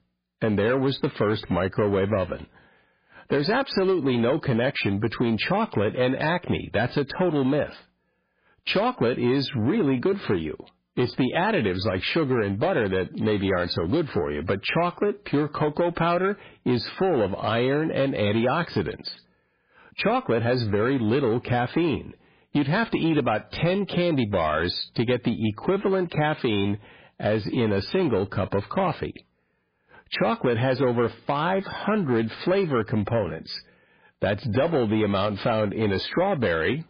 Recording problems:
garbled, watery; badly; nothing above 4 kHz
distortion; slight; 10 dB below the speech

